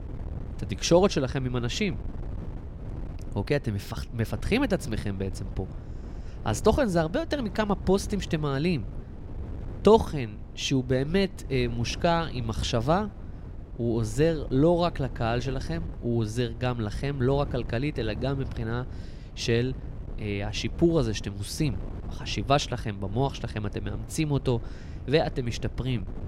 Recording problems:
wind noise on the microphone; occasional gusts; 20 dB below the speech

